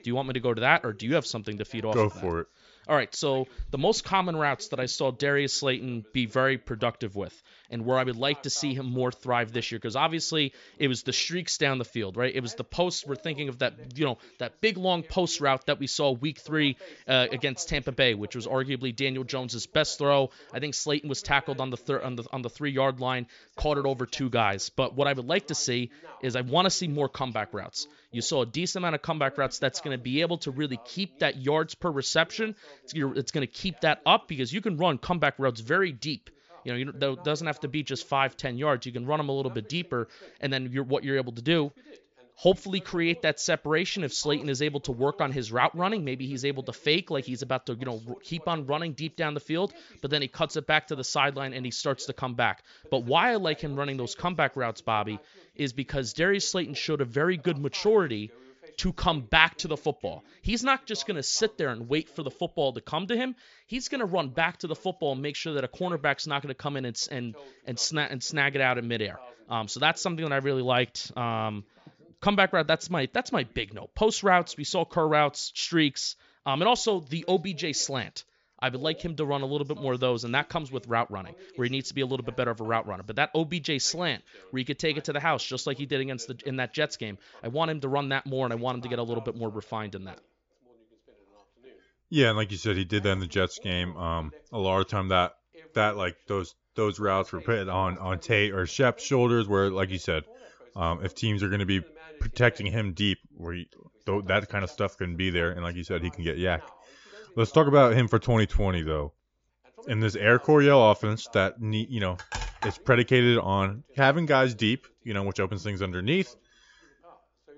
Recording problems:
high frequencies cut off; noticeable; nothing above 7.5 kHz
voice in the background; faint; throughout; 25 dB below the speech

